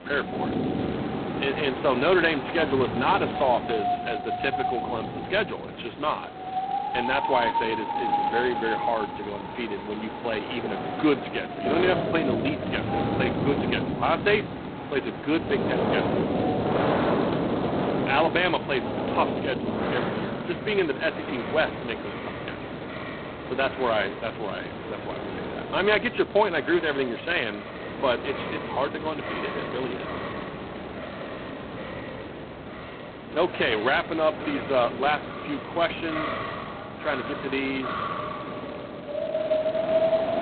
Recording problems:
phone-call audio; poor line; nothing above 4 kHz
wind in the background; loud; throughout; 3 dB below the speech

